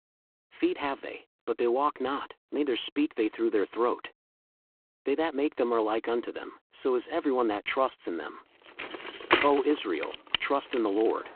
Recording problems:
phone-call audio; poor line
traffic noise; loud; from 8.5 s on; 2 dB below the speech

